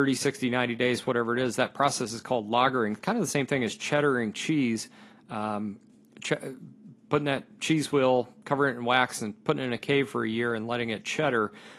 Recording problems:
garbled, watery; slightly; nothing above 11.5 kHz
abrupt cut into speech; at the start

